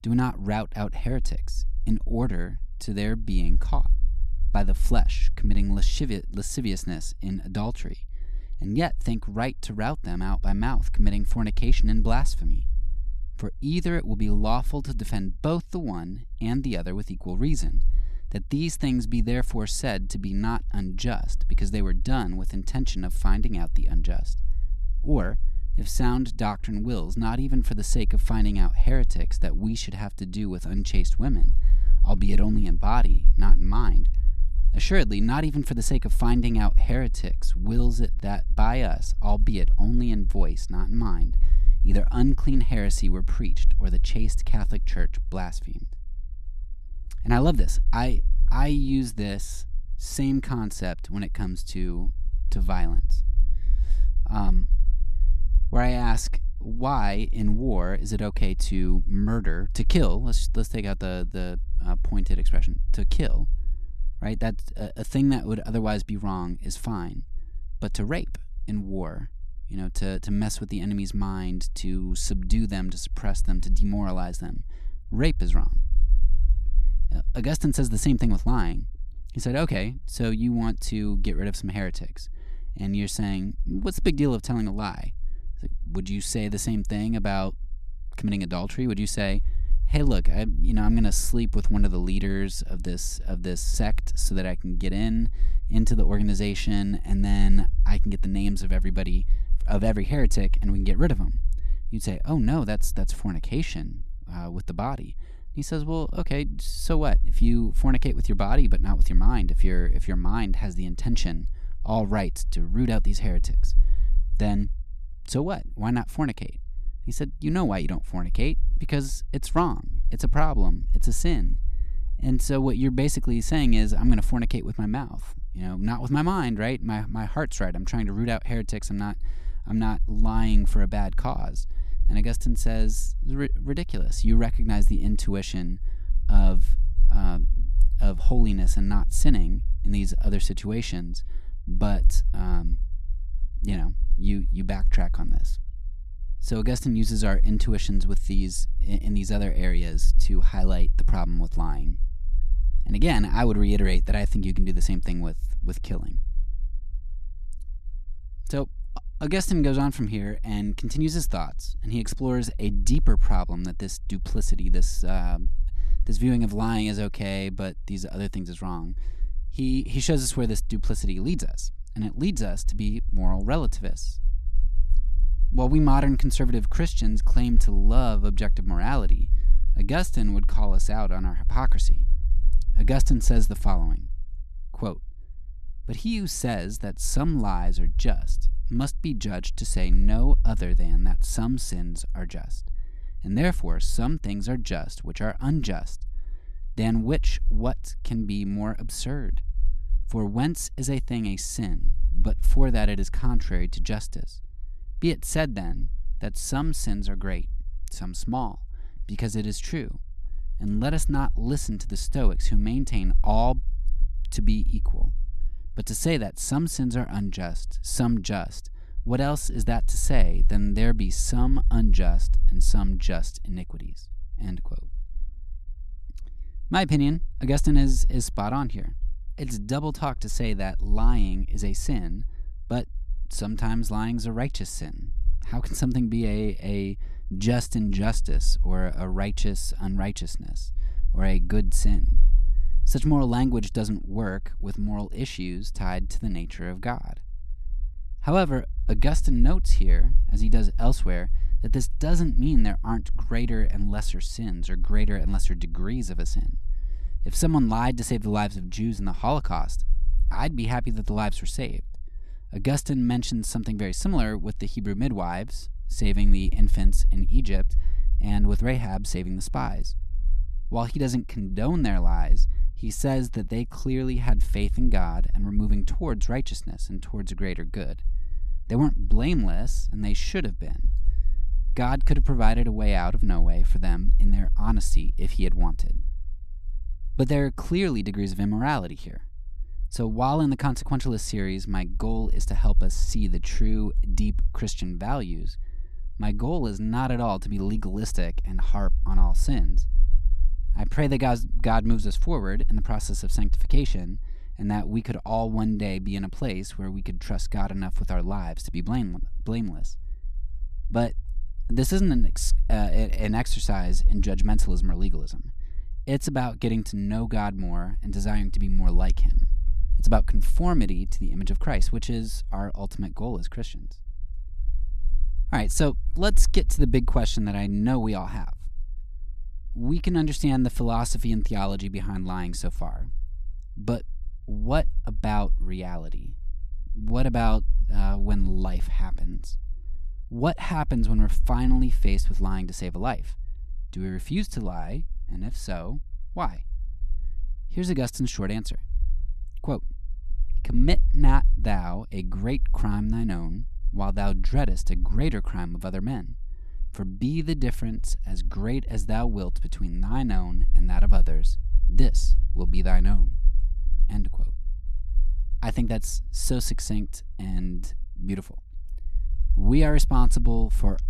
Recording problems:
low rumble; faint; throughout; 25 dB below the speech

